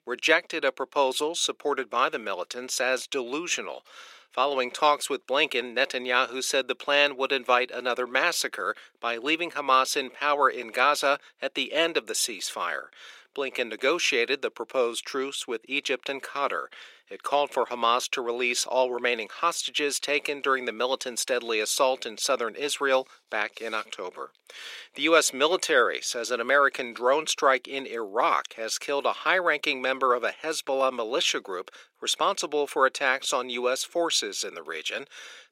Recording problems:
thin; somewhat; fading below 350 Hz

